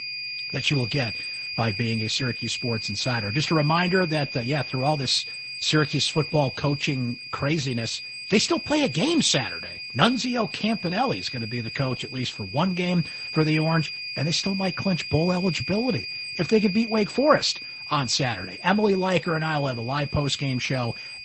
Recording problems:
garbled, watery; slightly; nothing above 8 kHz
high-pitched whine; loud; throughout; 2.5 kHz, 7 dB below the speech

